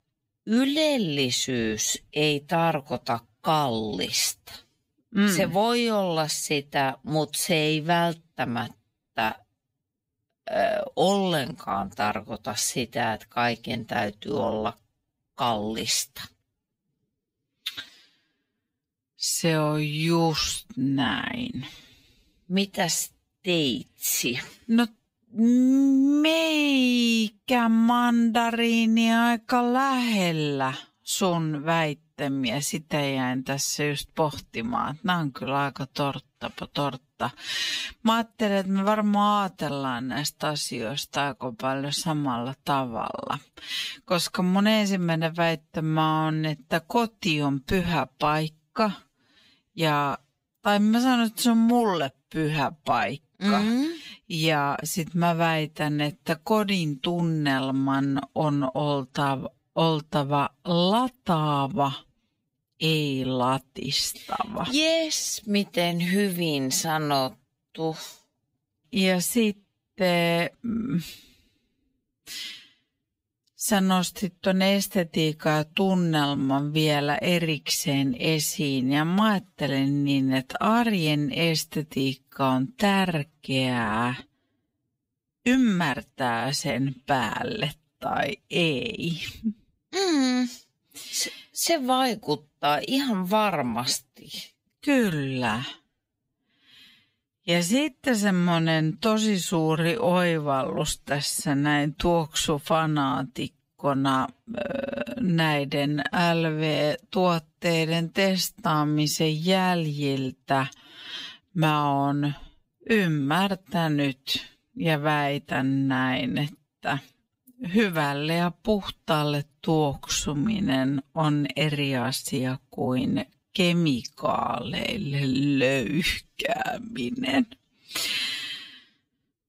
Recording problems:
wrong speed, natural pitch; too slow; 0.6 times normal speed

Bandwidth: 15.5 kHz